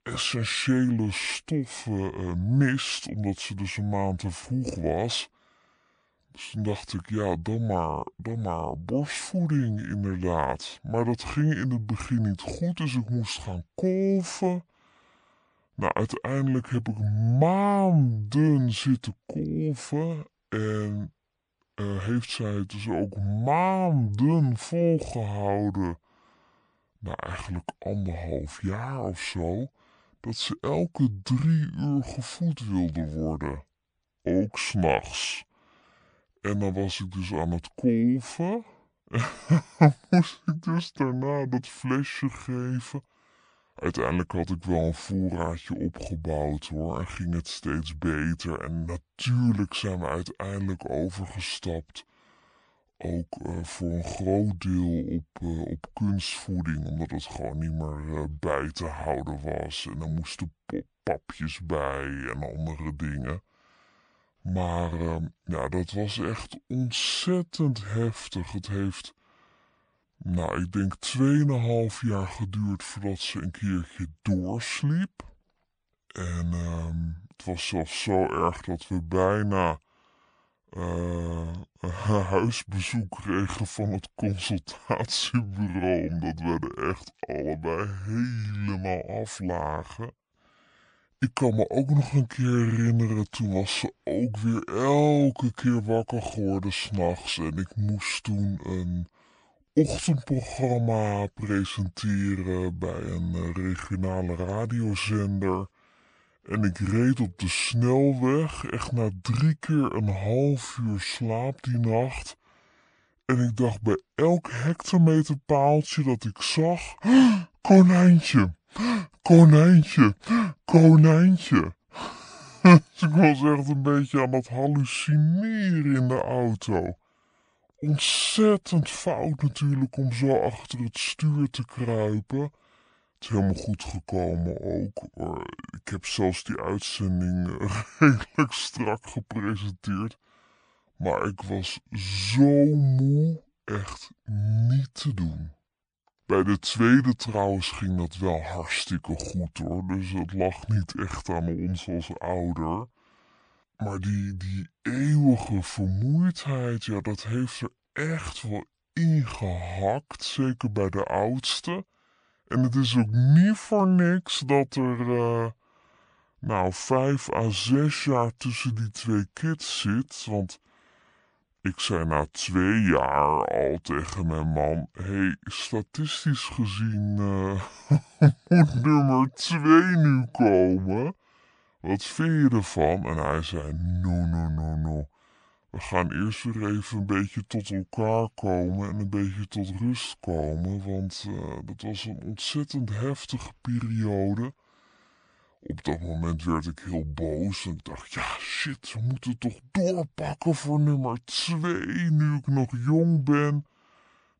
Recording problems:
wrong speed and pitch; too slow and too low; 0.6 times normal speed

